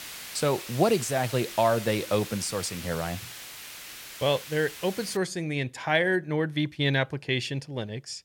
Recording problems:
hiss; noticeable; until 5 s; 10 dB below the speech

